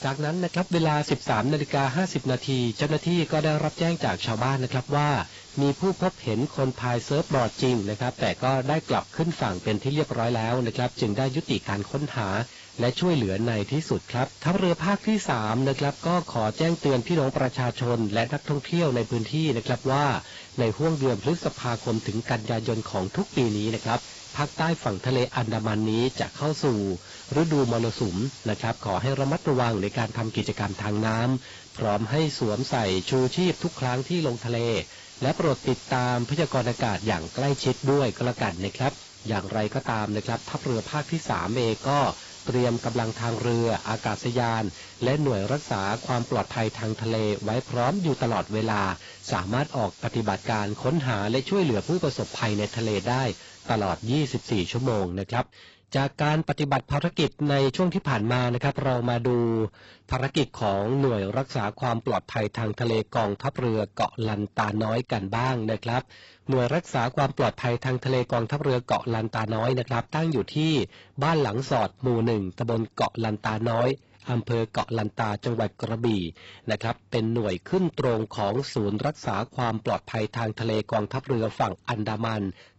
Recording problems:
garbled, watery; badly; nothing above 8 kHz
distortion; slight; 5% of the sound clipped
hiss; noticeable; until 55 s; 15 dB below the speech

